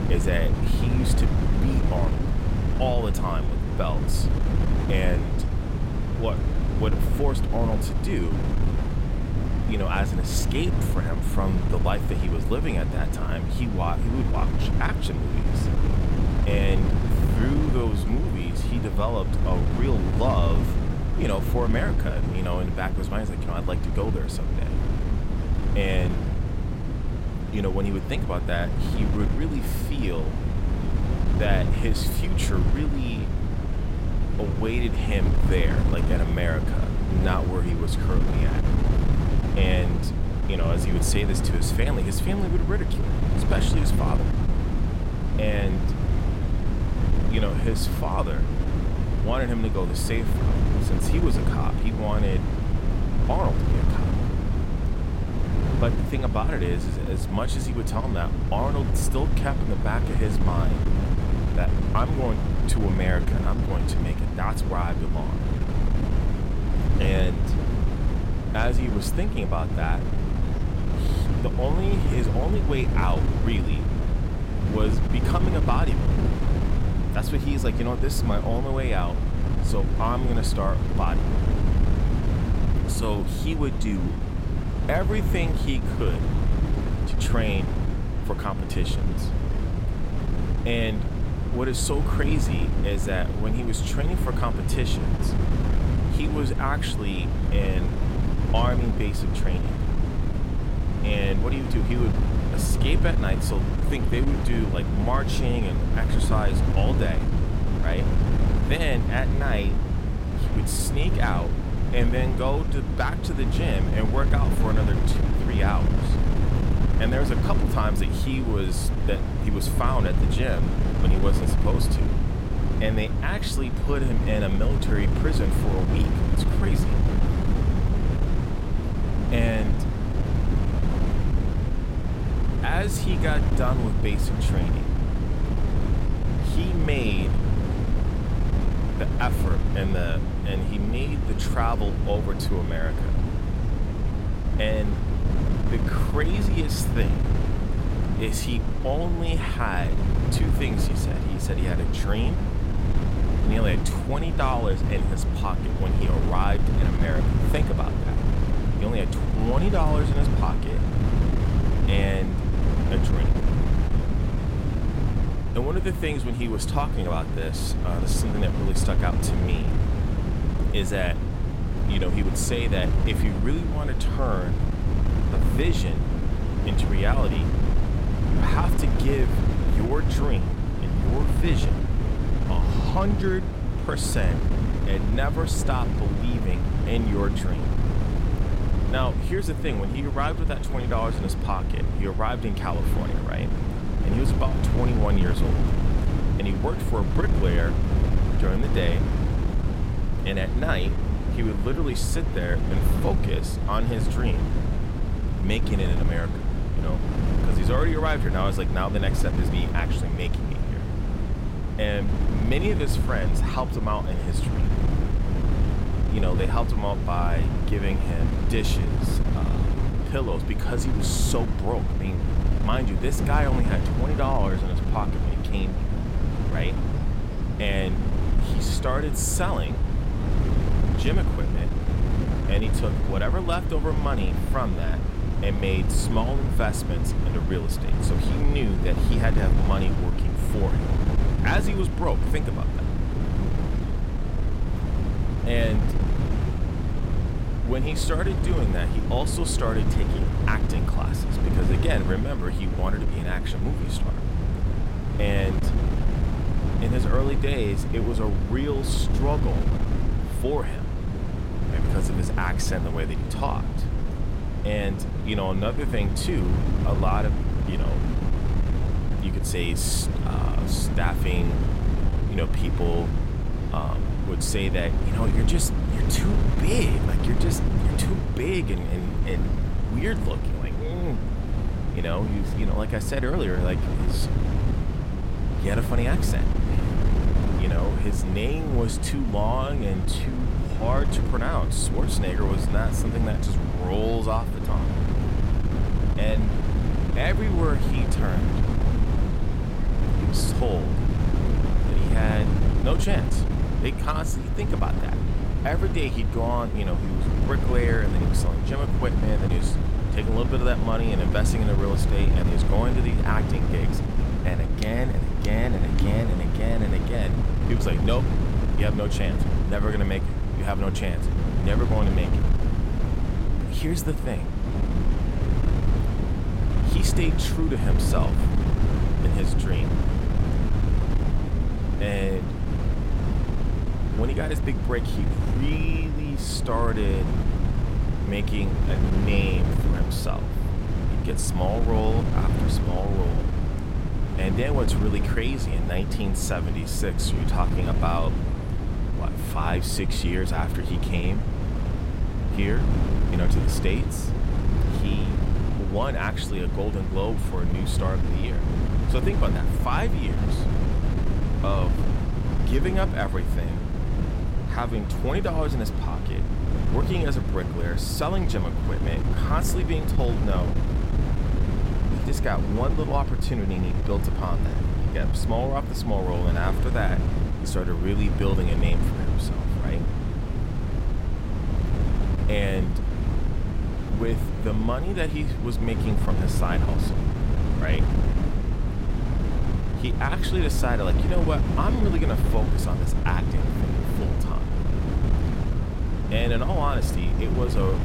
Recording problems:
wind noise on the microphone; heavy; 4 dB below the speech
background chatter; faint; throughout; 3 voices, 25 dB below the speech

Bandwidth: 16 kHz